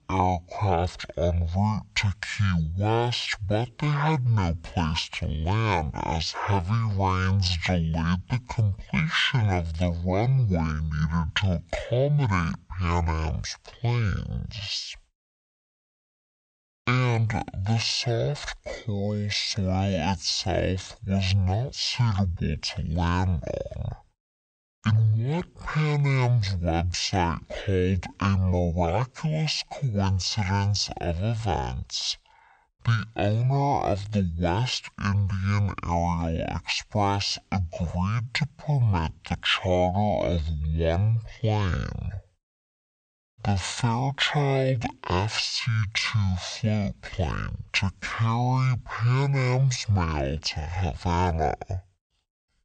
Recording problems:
wrong speed and pitch; too slow and too low; 0.5 times normal speed

